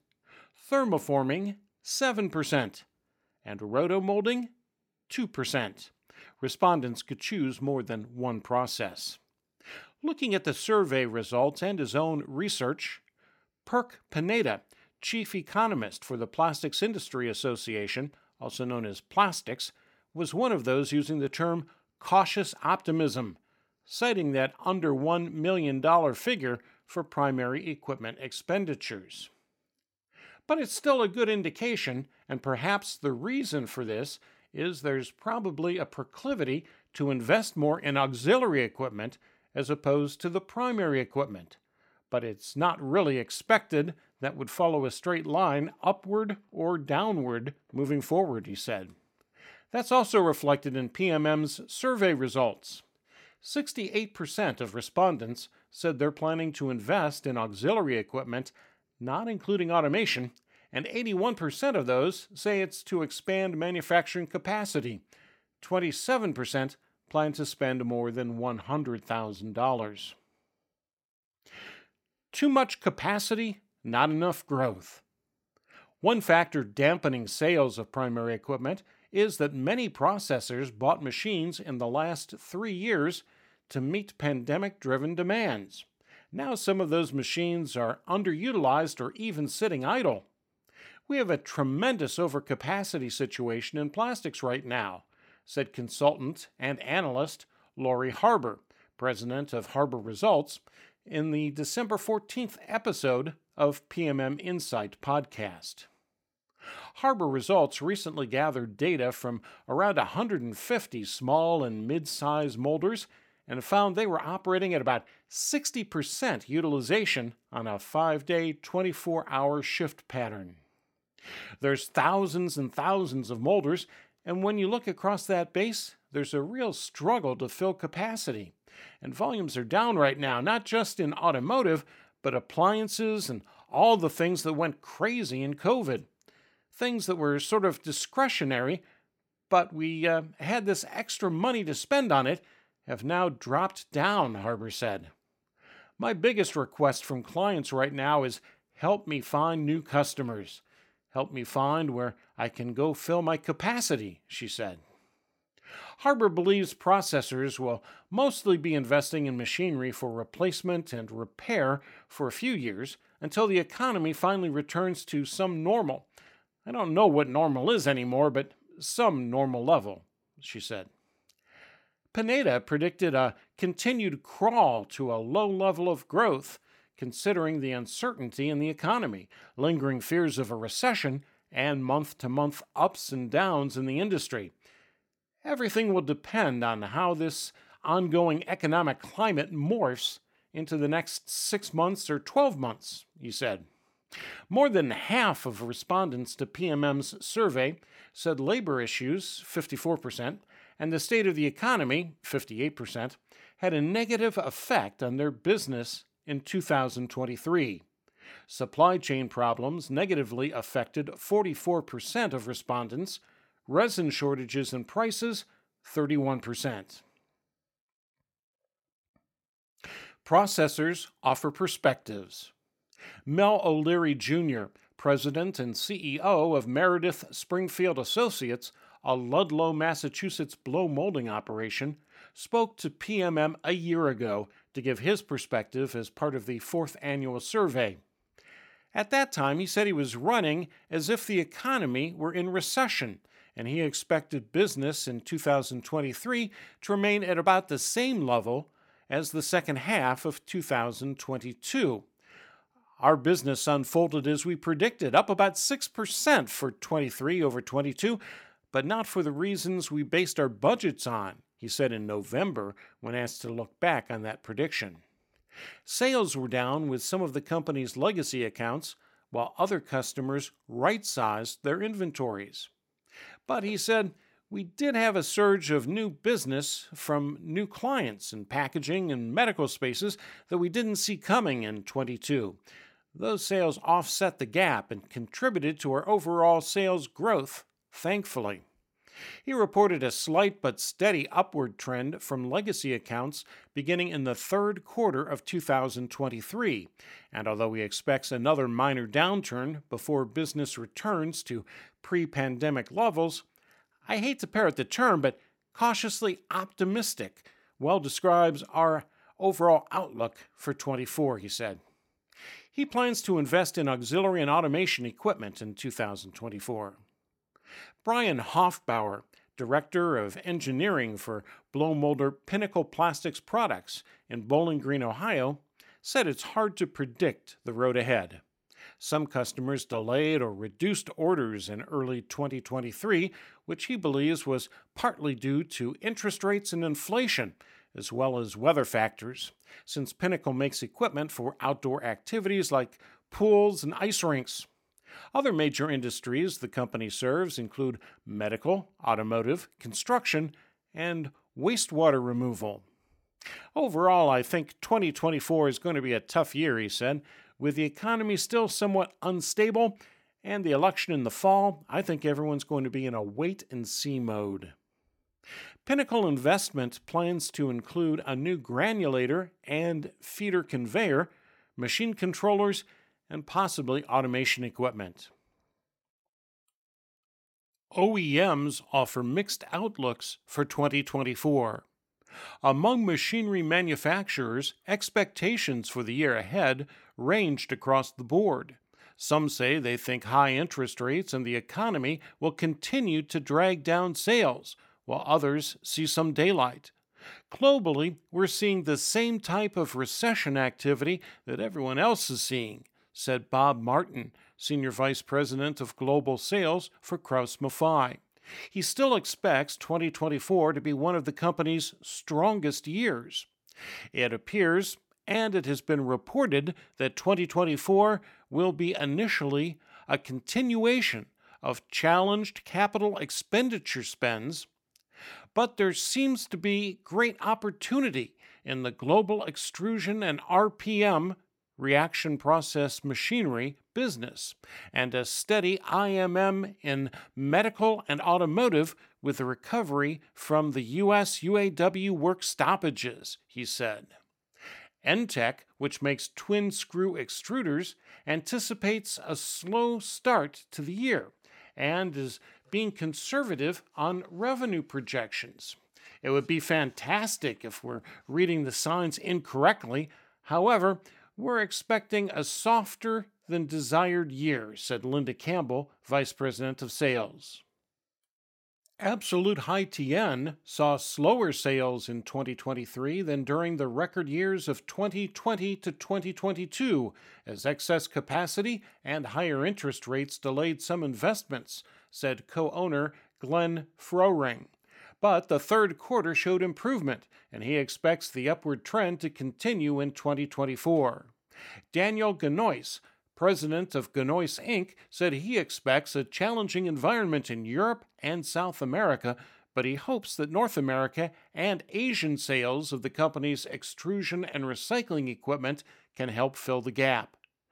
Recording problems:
none

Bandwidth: 17 kHz